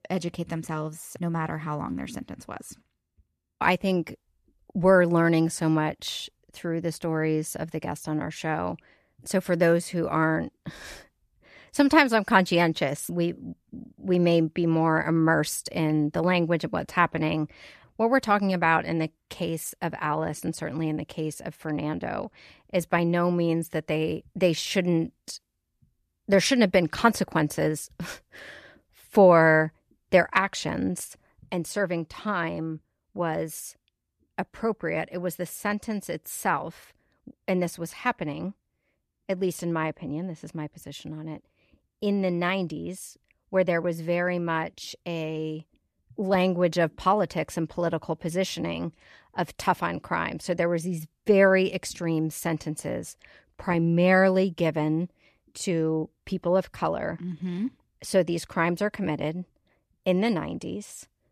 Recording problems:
none

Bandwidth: 14.5 kHz